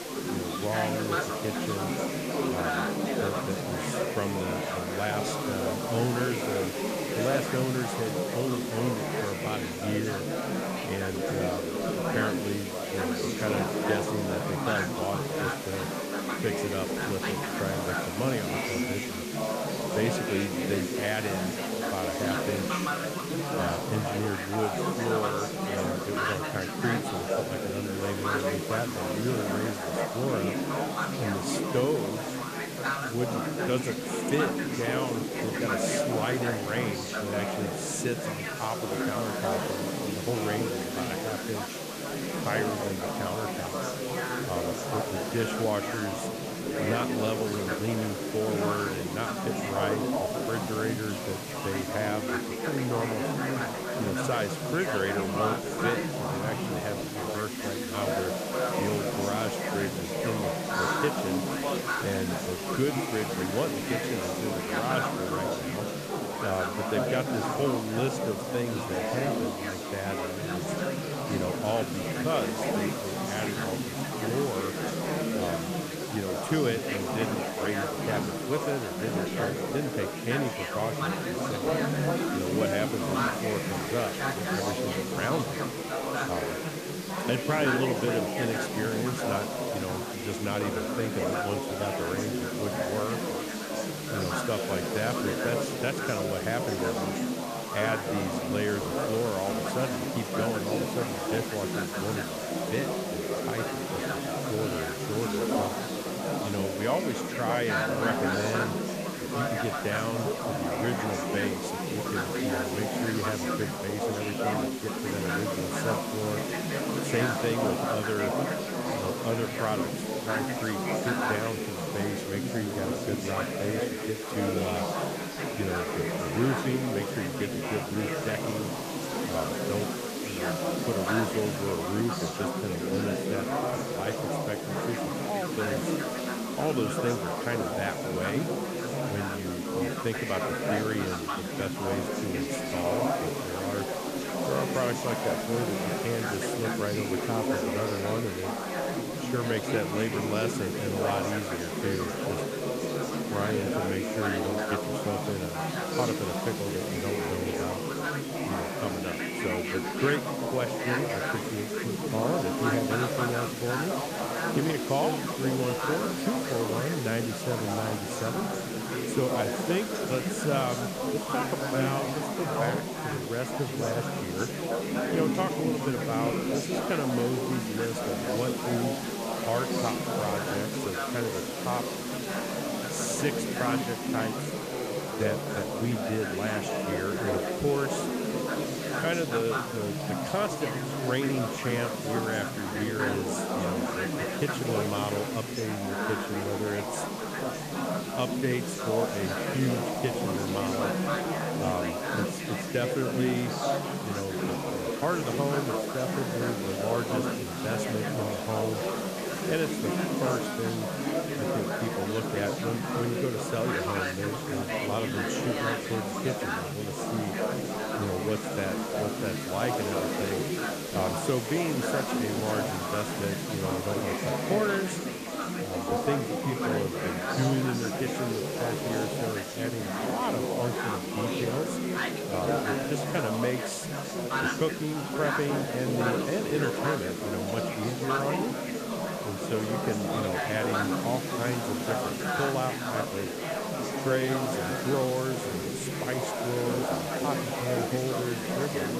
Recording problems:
chatter from many people; very loud; throughout; 2 dB above the speech
hiss; loud; throughout; 7 dB below the speech
abrupt cut into speech; at the end

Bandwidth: 14.5 kHz